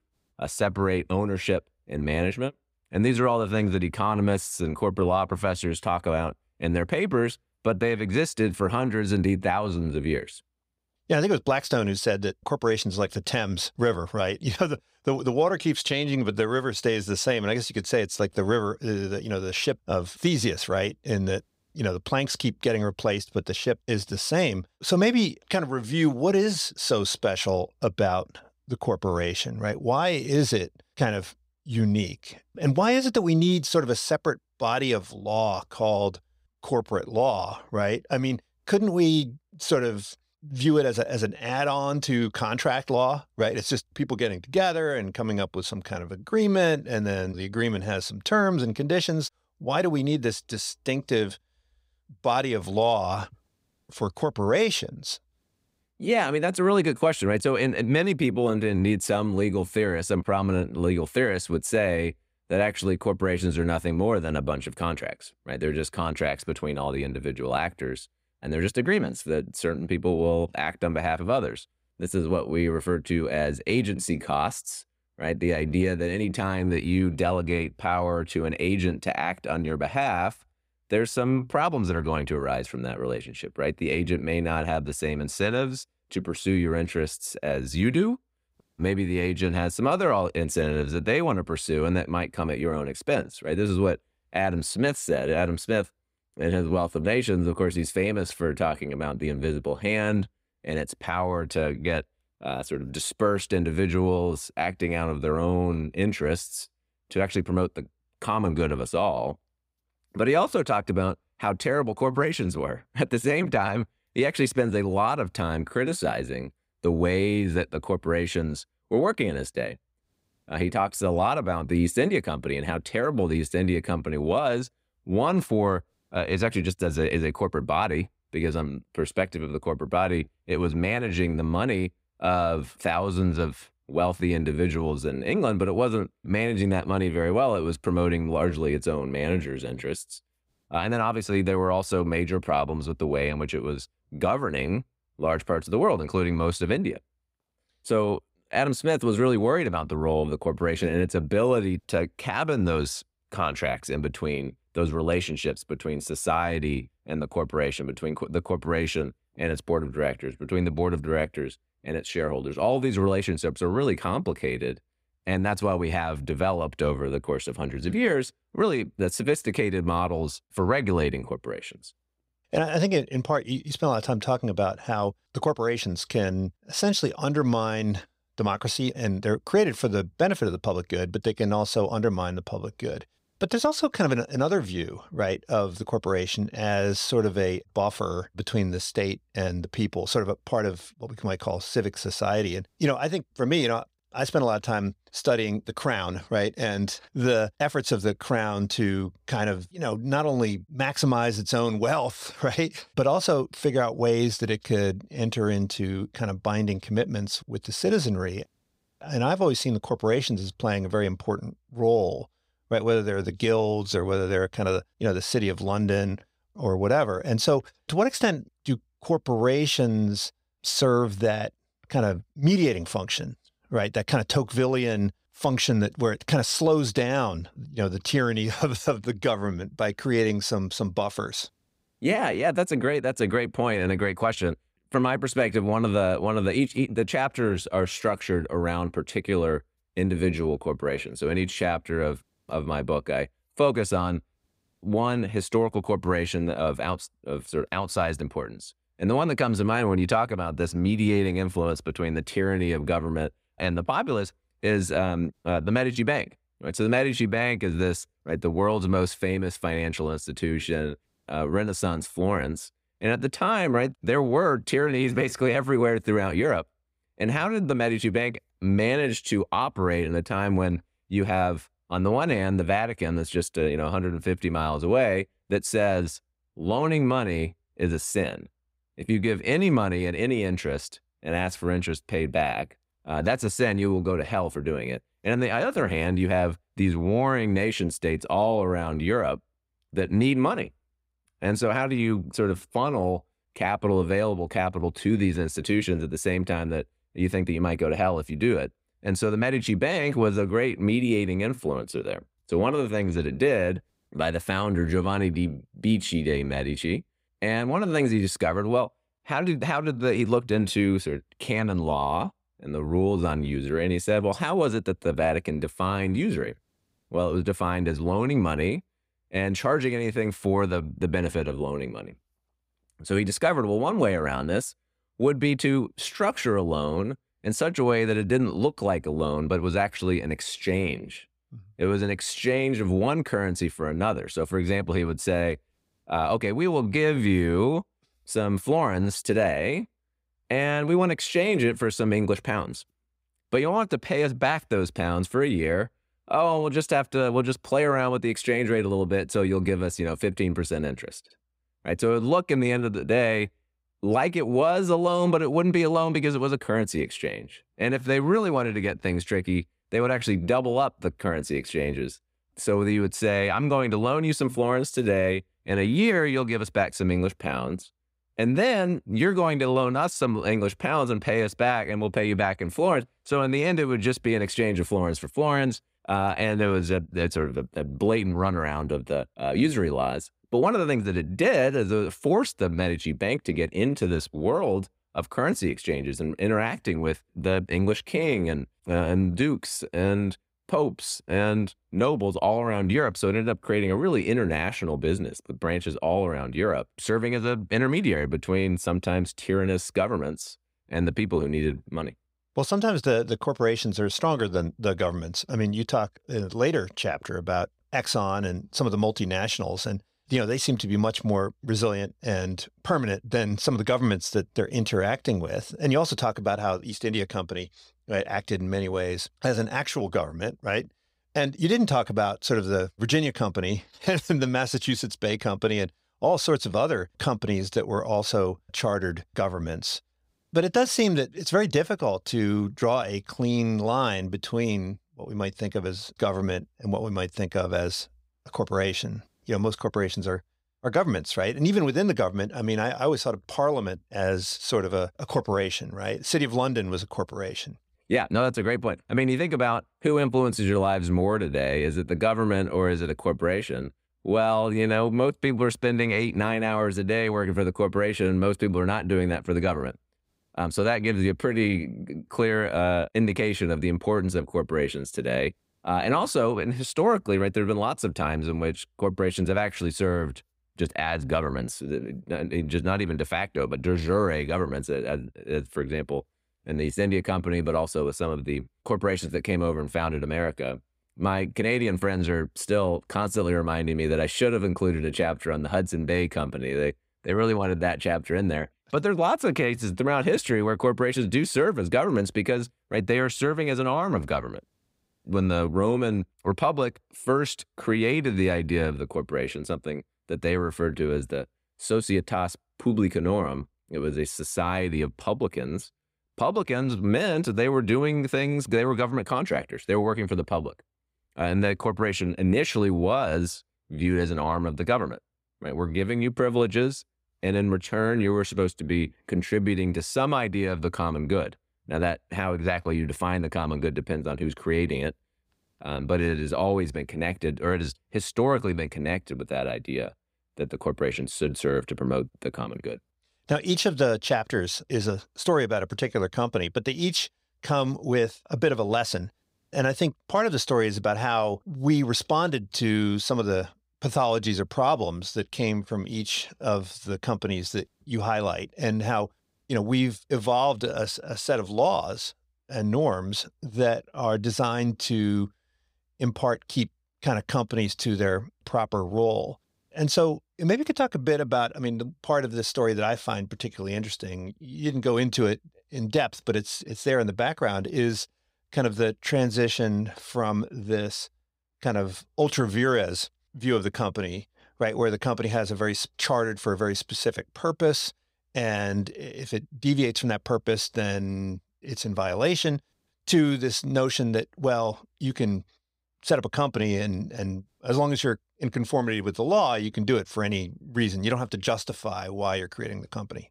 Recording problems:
none

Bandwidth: 15.5 kHz